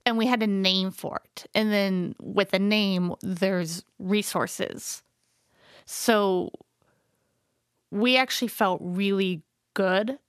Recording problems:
none

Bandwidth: 14.5 kHz